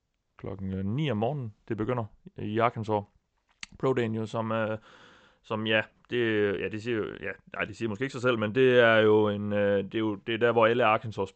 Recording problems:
high frequencies cut off; noticeable; nothing above 8 kHz

